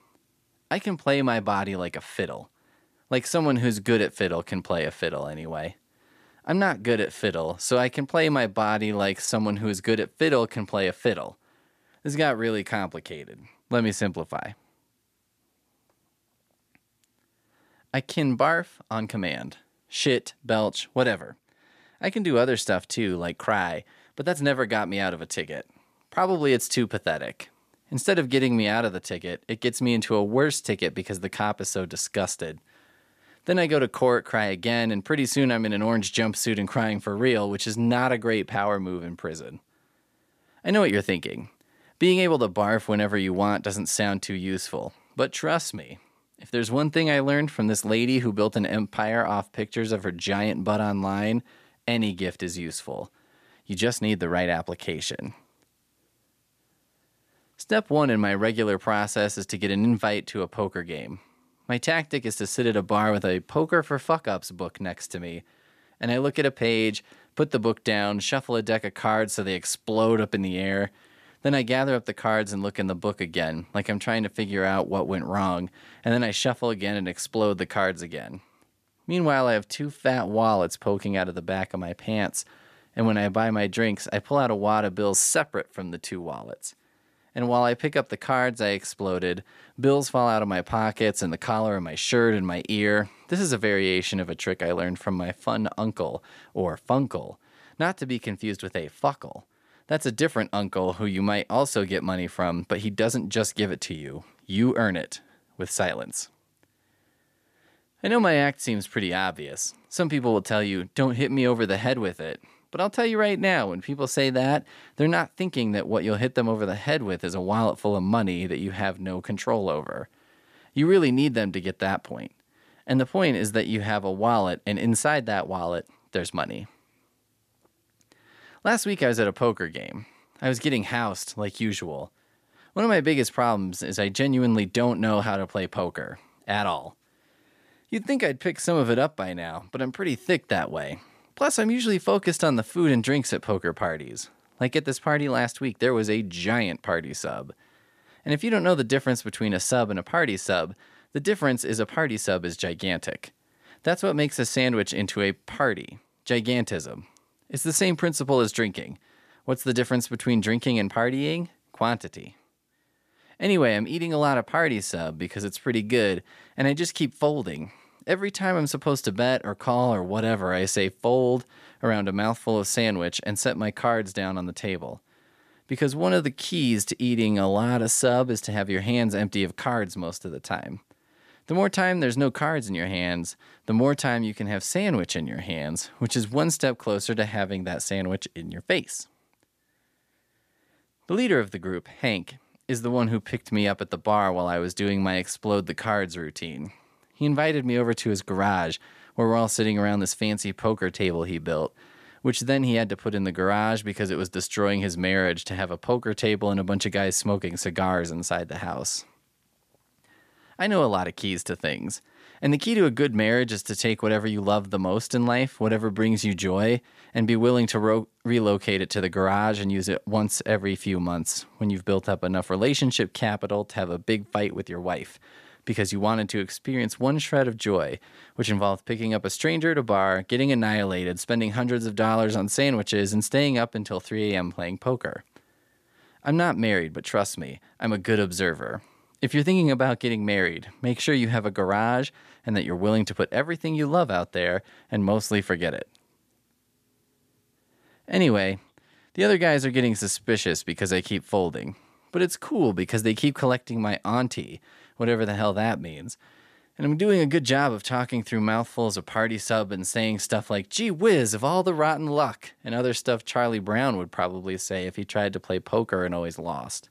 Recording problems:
none

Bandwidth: 14.5 kHz